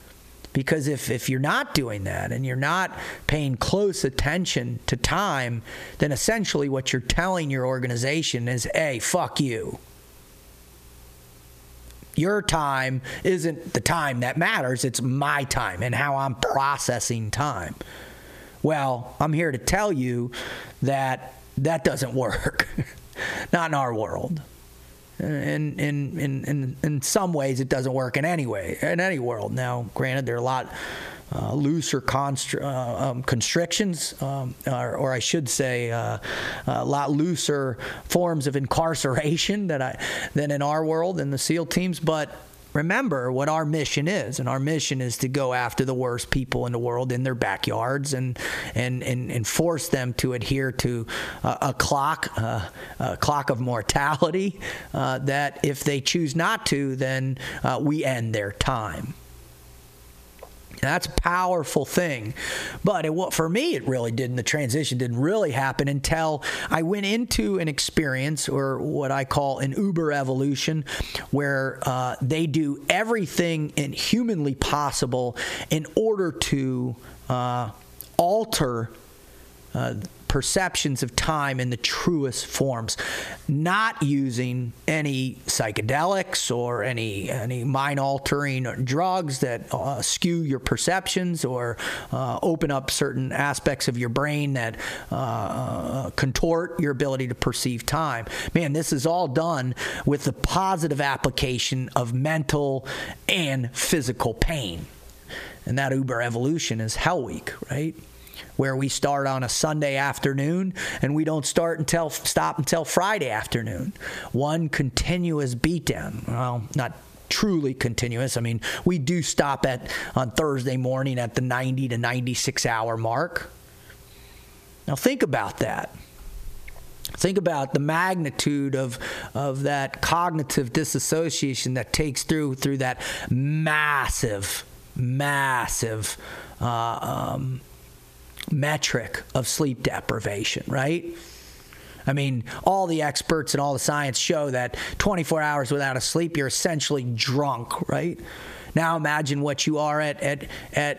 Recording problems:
squashed, flat; heavily

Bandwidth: 14.5 kHz